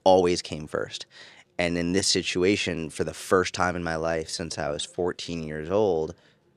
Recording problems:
uneven, jittery; strongly; from 1.5 to 6 s

